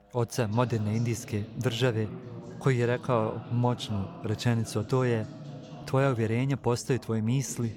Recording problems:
background chatter; noticeable; throughout; 2 voices, 15 dB below the speech

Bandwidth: 18 kHz